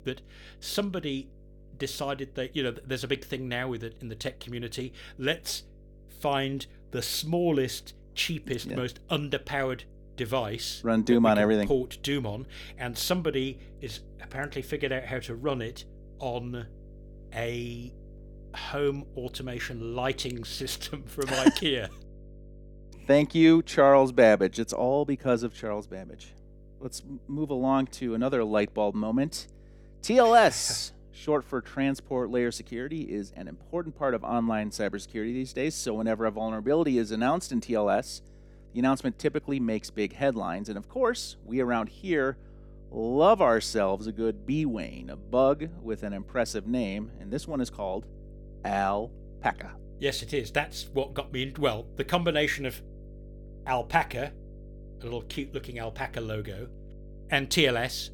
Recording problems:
electrical hum; faint; throughout; 50 Hz, 30 dB below the speech

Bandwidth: 18 kHz